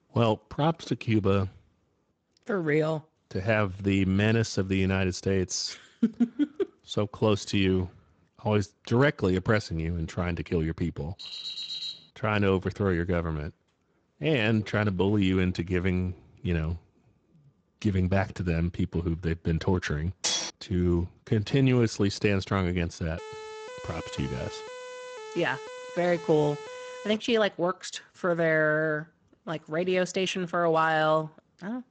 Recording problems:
garbled, watery; slightly; nothing above 7.5 kHz
alarm; noticeable; at 11 s; peak 5 dB below the speech
clattering dishes; loud; at 20 s; peak level with the speech
siren; faint; from 23 to 27 s; peak 15 dB below the speech

